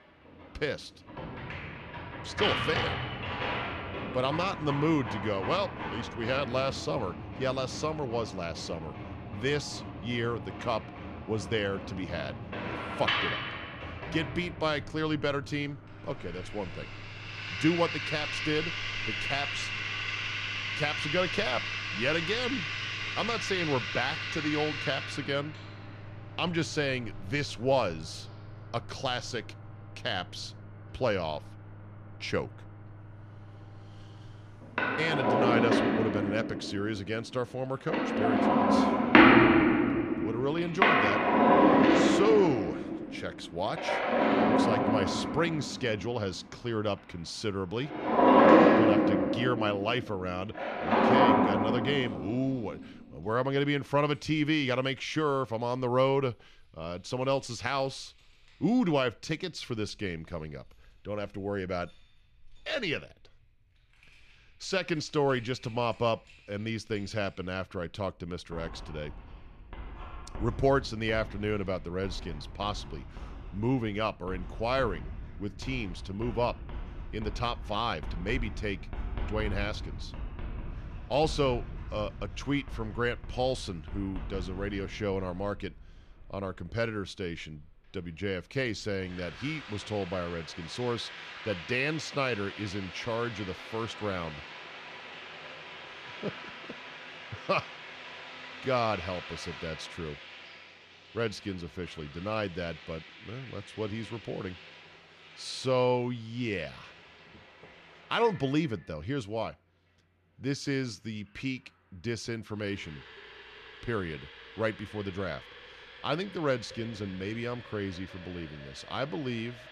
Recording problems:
household noises; very loud; throughout; 3 dB above the speech

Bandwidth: 13.5 kHz